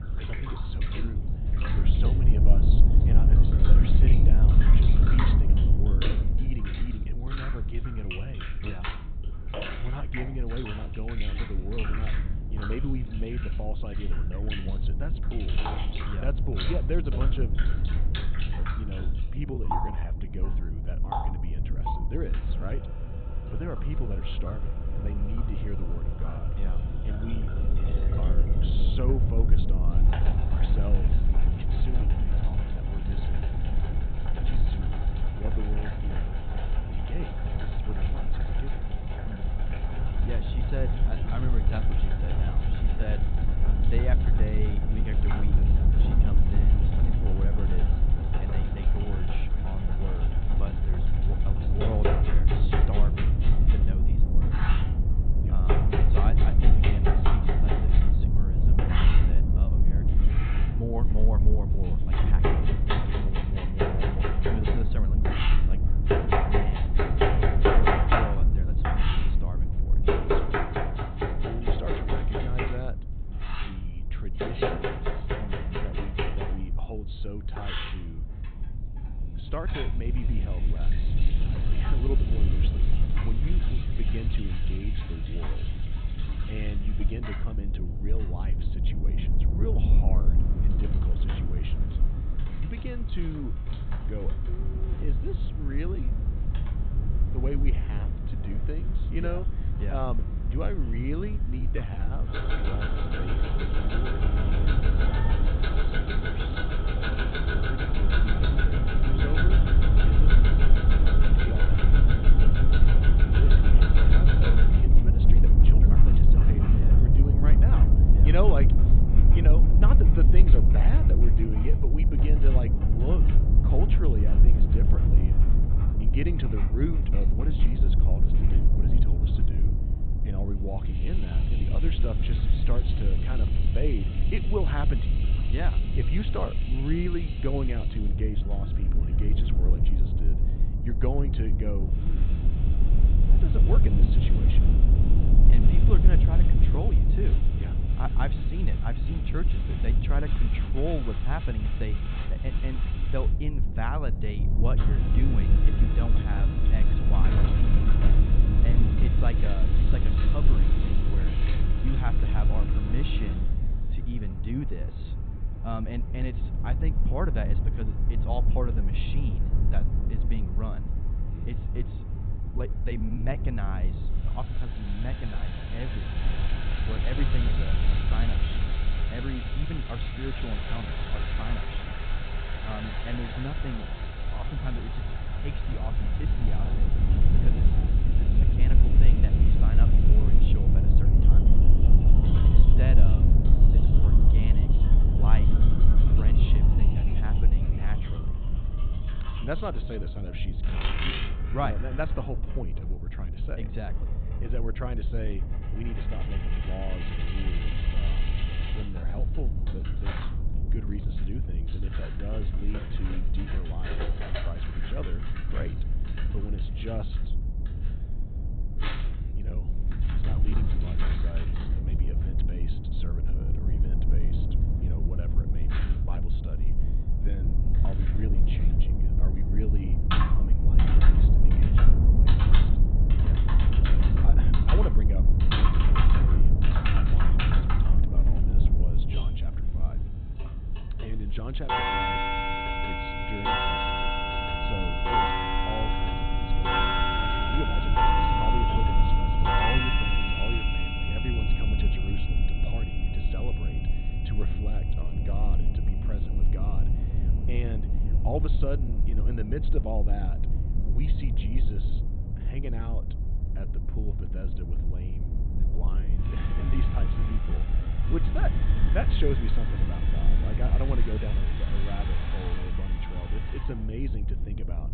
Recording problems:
high frequencies cut off; severe; nothing above 4 kHz
household noises; very loud; throughout; 3 dB above the speech
low rumble; loud; throughout; 2 dB below the speech
uneven, jittery; strongly; from 19 s to 4:28

